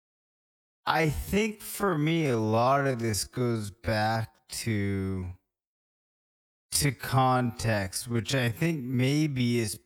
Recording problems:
wrong speed, natural pitch; too slow; 0.5 times normal speed

